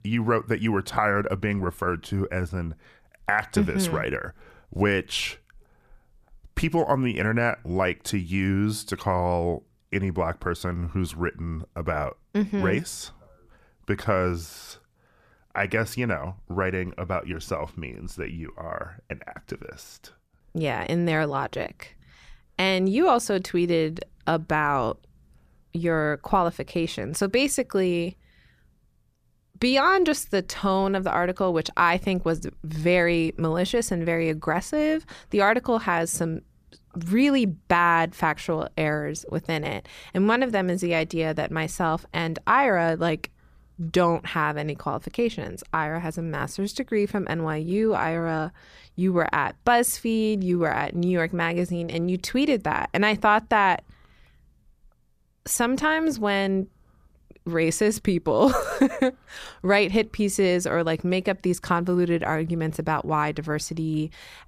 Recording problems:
none

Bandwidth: 14.5 kHz